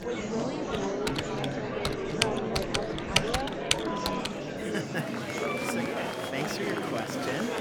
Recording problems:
household noises; very loud; until 4 s; 5 dB above the speech
murmuring crowd; very loud; throughout; 4 dB above the speech

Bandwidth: 18.5 kHz